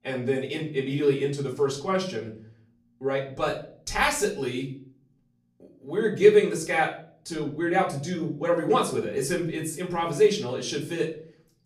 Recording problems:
off-mic speech; far
room echo; slight; dies away in 0.4 s

